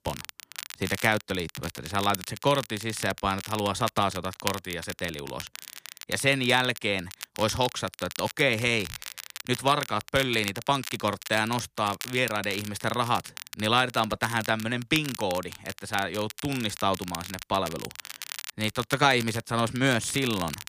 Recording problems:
crackle, like an old record; noticeable; 10 dB below the speech

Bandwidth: 15 kHz